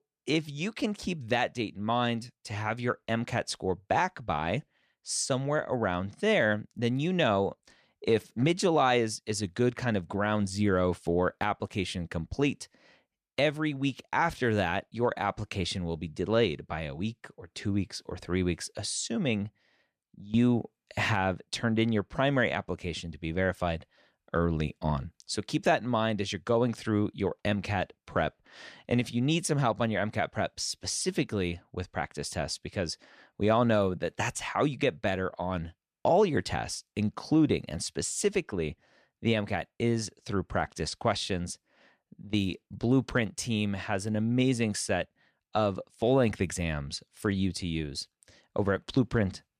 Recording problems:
none

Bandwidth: 14.5 kHz